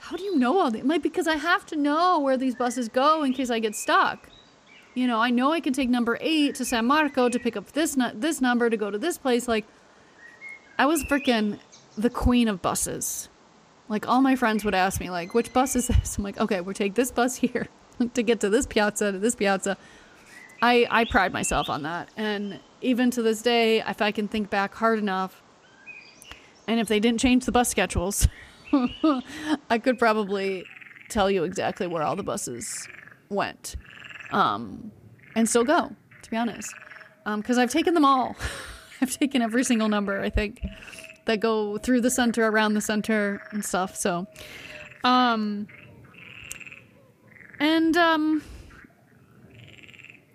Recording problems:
animal sounds; faint; throughout; 20 dB below the speech

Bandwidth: 15 kHz